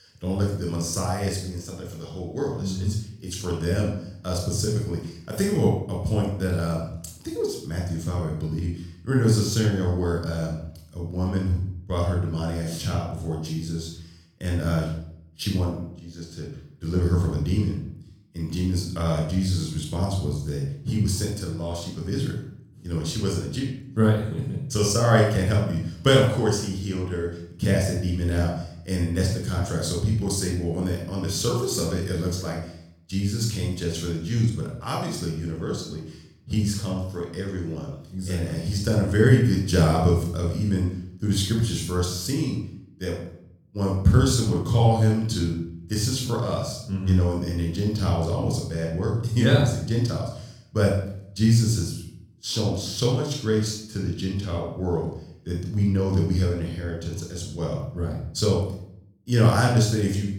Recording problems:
room echo; noticeable; dies away in 0.6 s
off-mic speech; somewhat distant

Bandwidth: 18 kHz